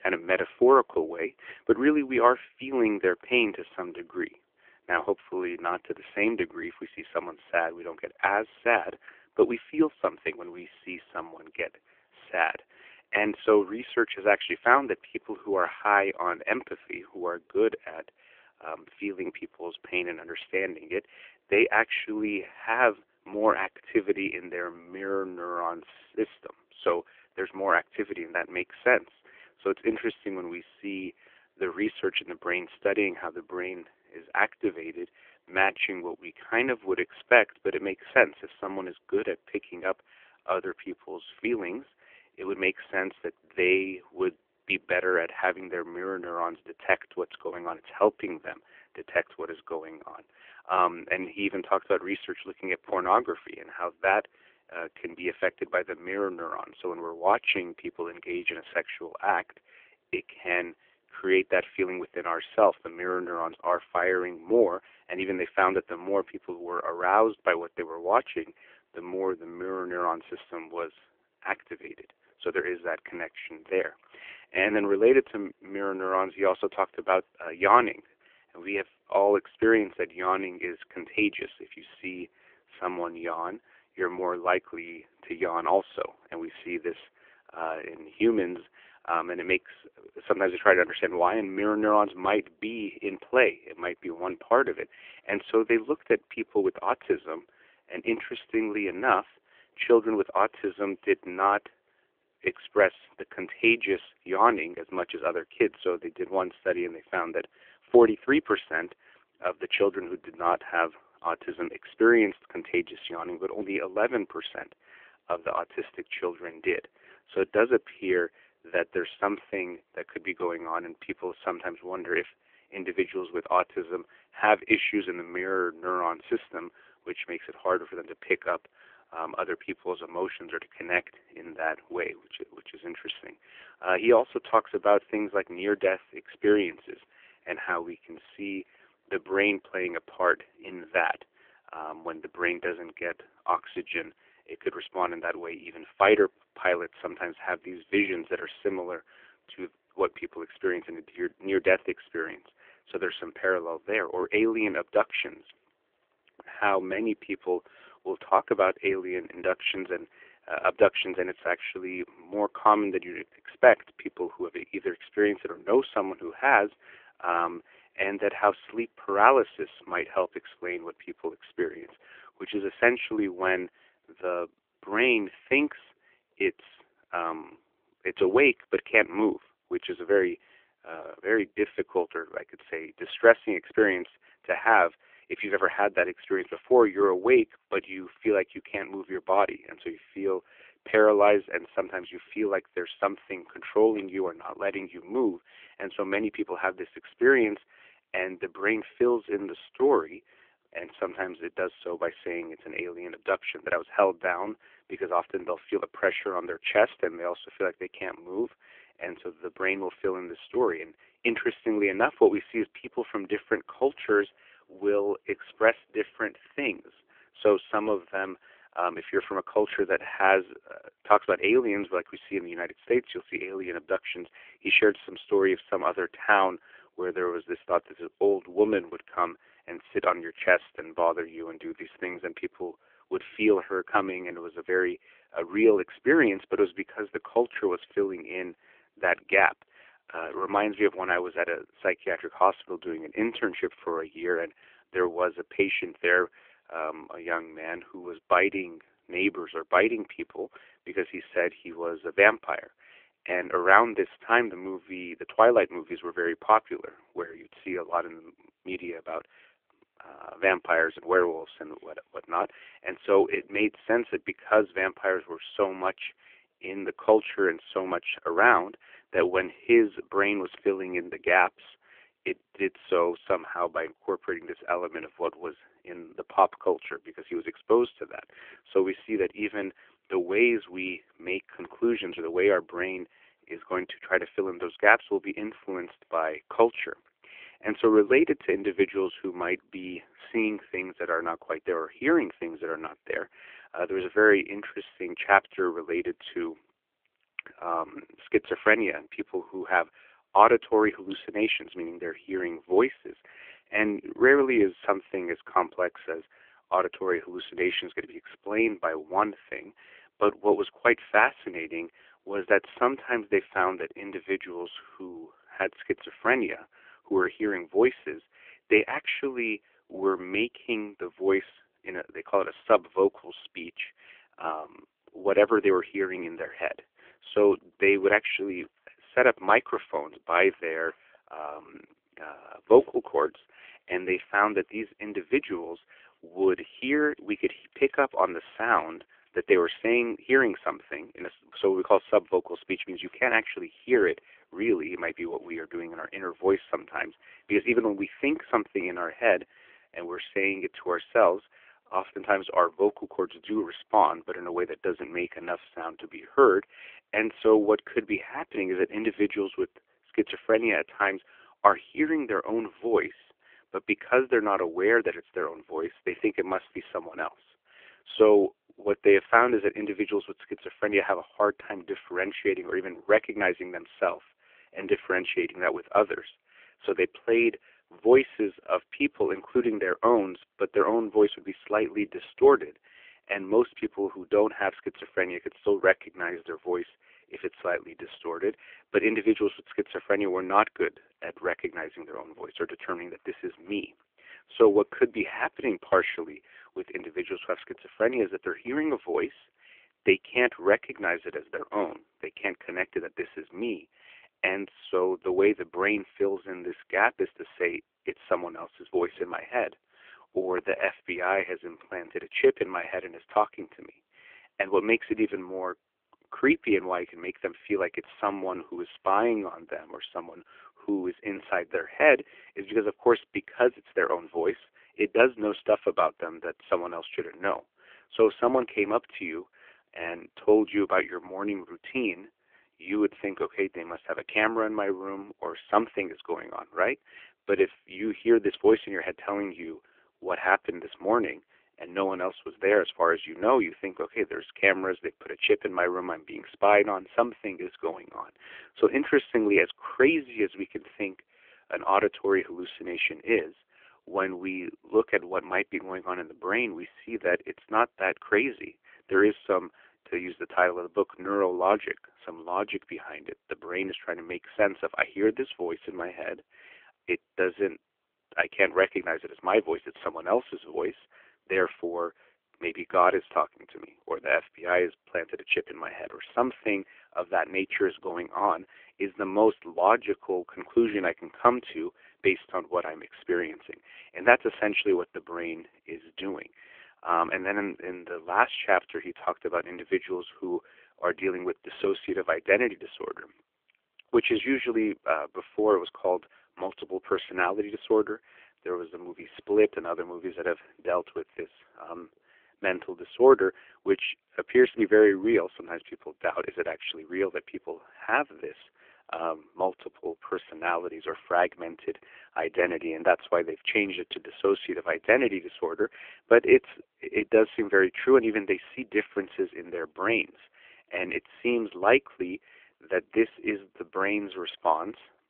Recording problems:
phone-call audio

